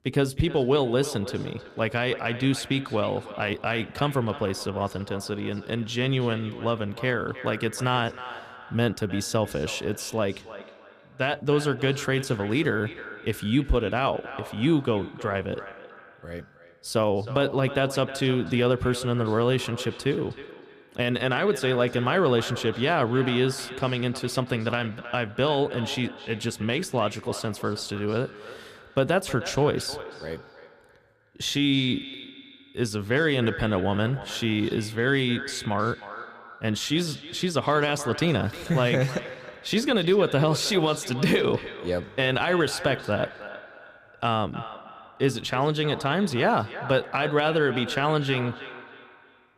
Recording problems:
echo of what is said; noticeable; throughout; 310 ms later, 15 dB below the speech

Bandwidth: 14.5 kHz